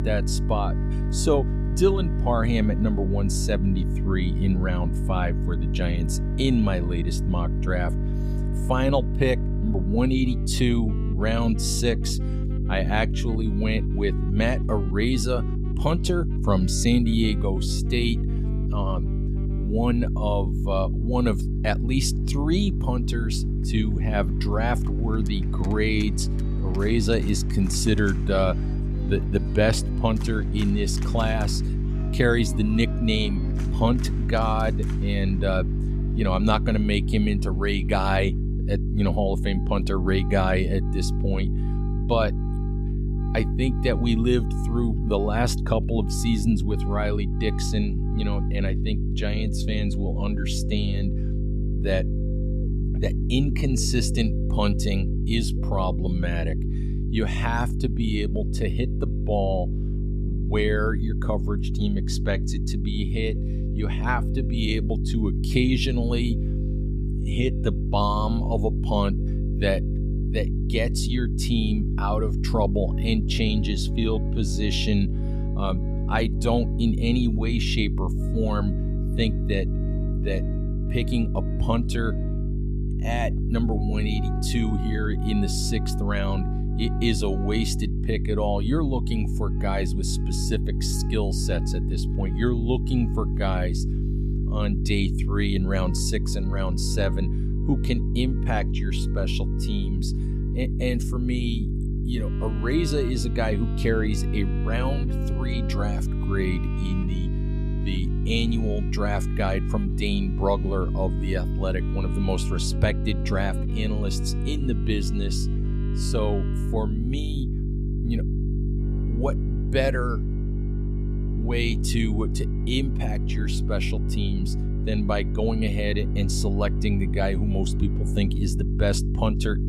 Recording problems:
electrical hum; loud; throughout; 50 Hz, 9 dB below the speech
background music; noticeable; throughout; 20 dB below the speech

